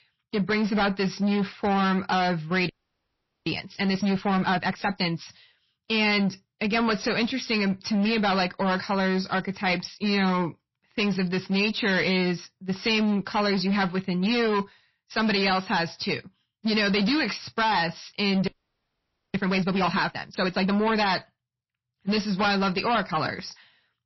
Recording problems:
distortion; heavy; 19% of the sound clipped
garbled, watery; slightly; nothing above 5.5 kHz
audio freezing; at 2.5 s for 1 s and at 18 s for 1 s

